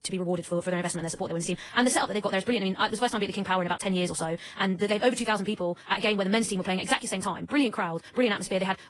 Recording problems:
wrong speed, natural pitch; too fast; 1.8 times normal speed
garbled, watery; slightly; nothing above 10.5 kHz

